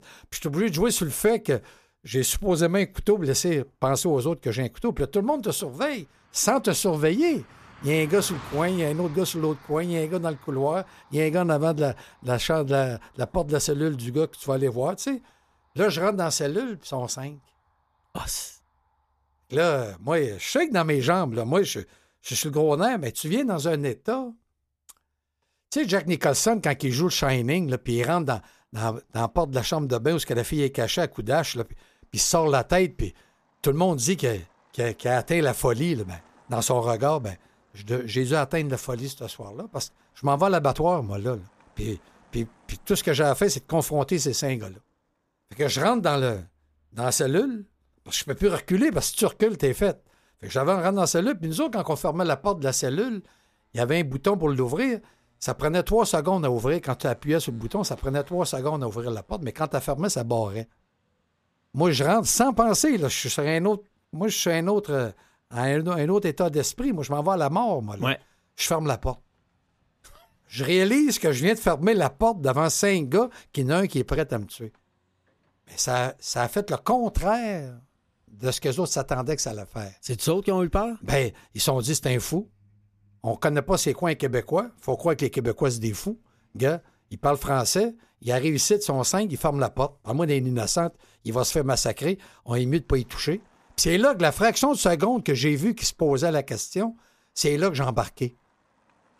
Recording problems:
traffic noise; faint; throughout; 30 dB below the speech

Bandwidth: 14.5 kHz